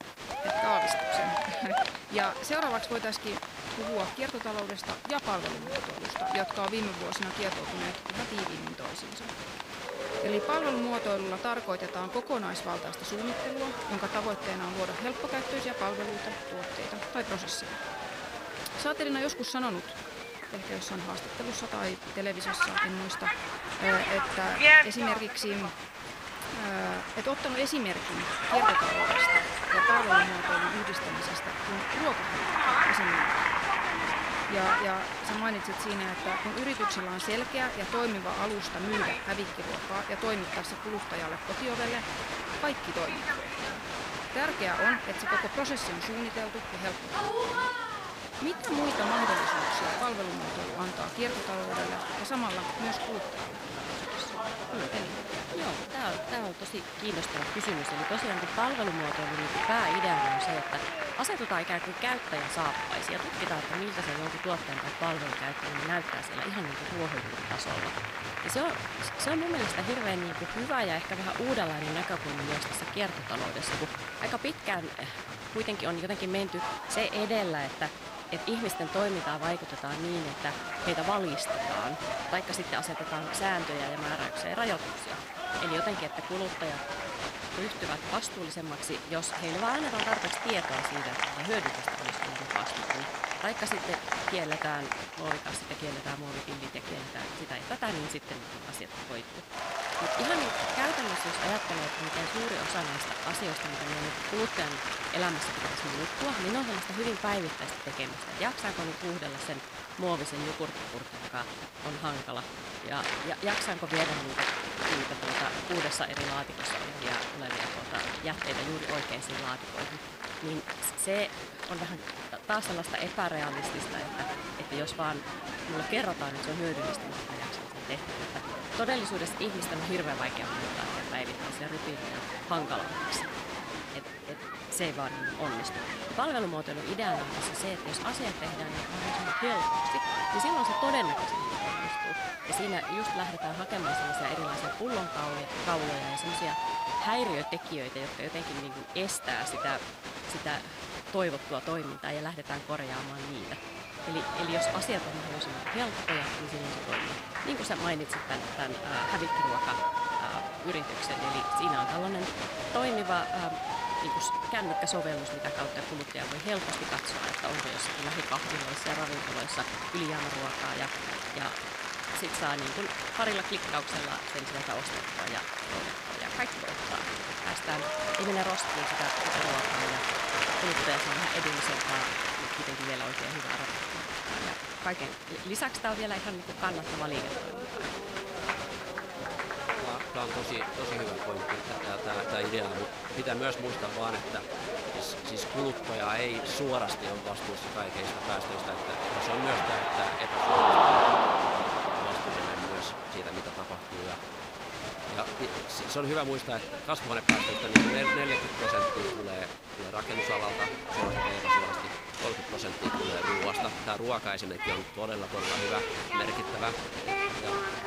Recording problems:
crowd noise; very loud; throughout; 3 dB above the speech
hiss; faint; throughout; 25 dB below the speech

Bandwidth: 15.5 kHz